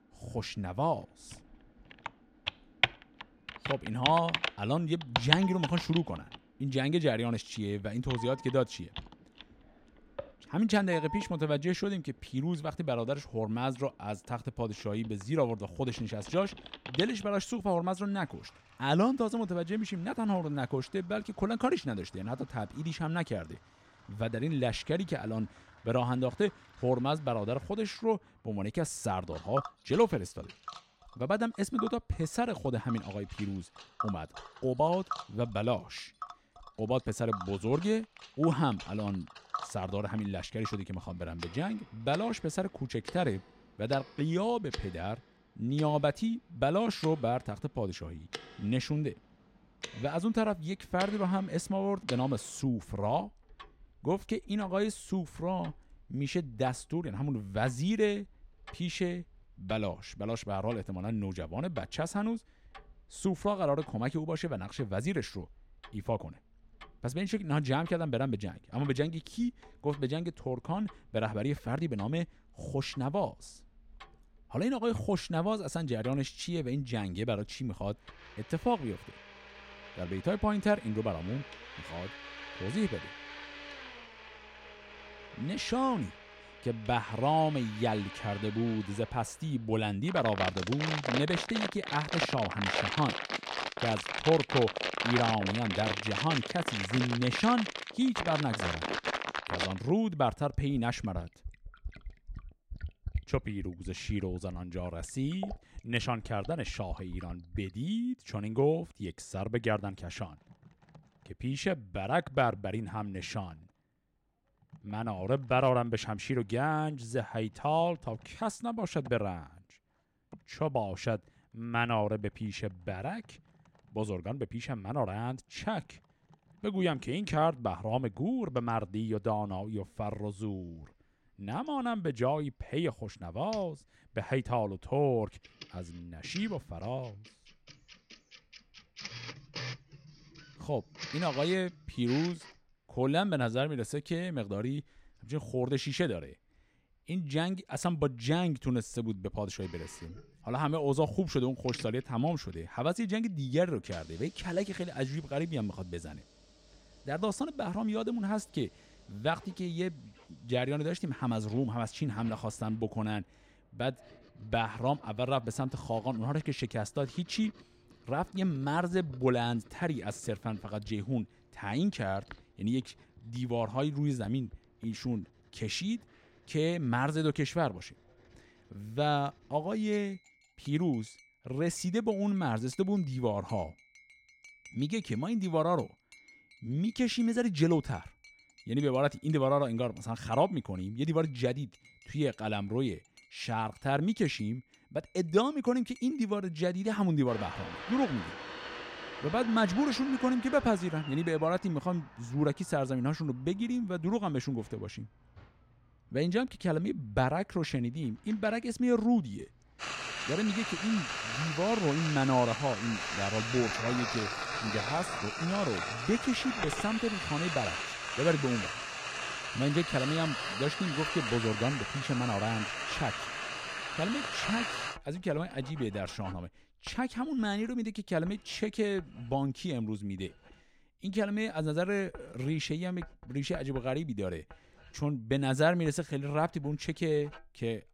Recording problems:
household noises; loud; throughout; 5 dB below the speech

